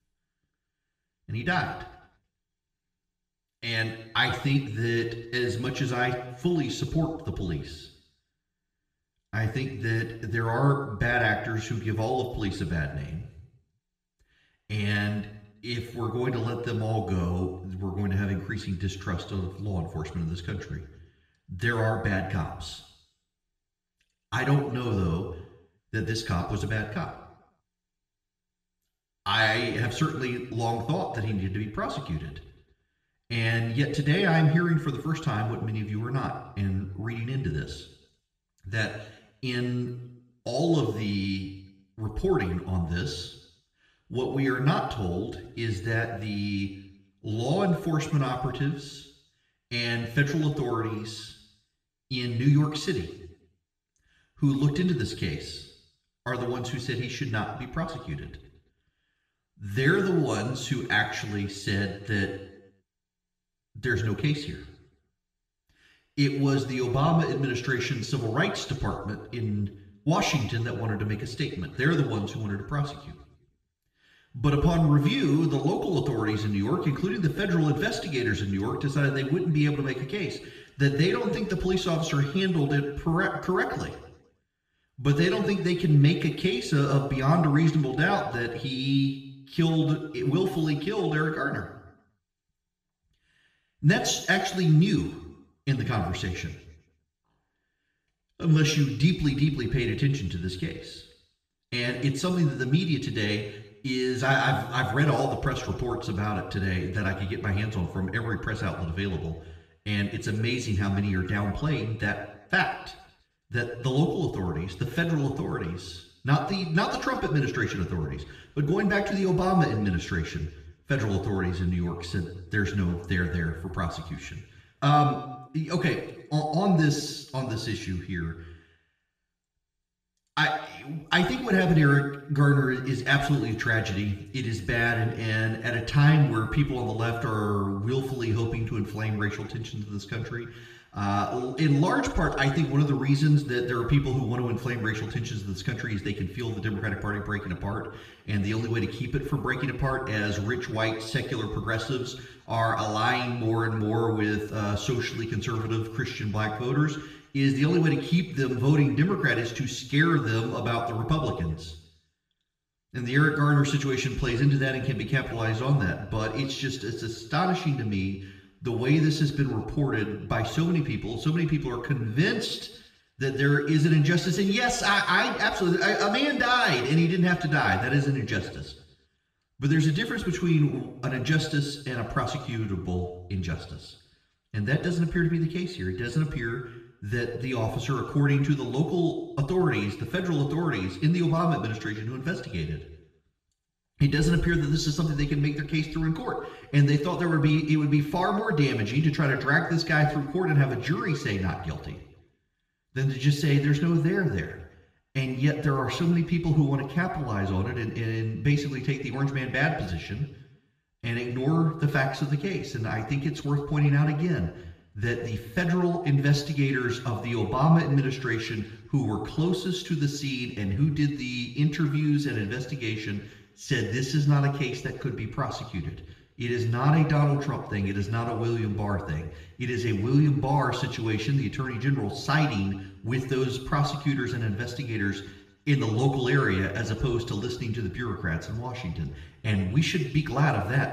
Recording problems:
room echo; noticeable; dies away in 0.8 s
off-mic speech; somewhat distant

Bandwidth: 14.5 kHz